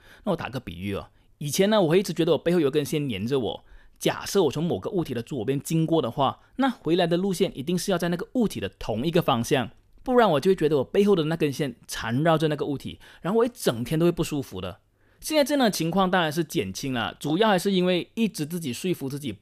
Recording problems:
none

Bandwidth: 14.5 kHz